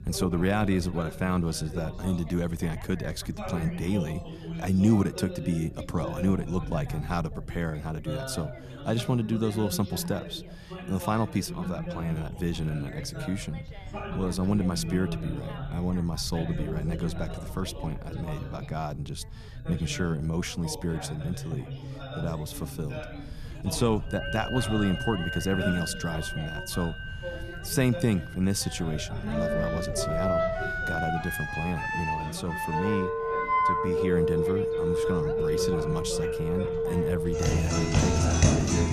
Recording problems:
background music; very loud; from 24 s on; 1 dB above the speech
background chatter; loud; throughout; 3 voices, 9 dB below the speech
low rumble; faint; throughout; 25 dB below the speech

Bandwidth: 14 kHz